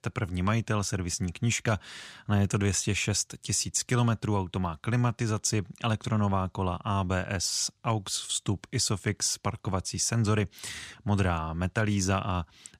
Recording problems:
none

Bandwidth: 14.5 kHz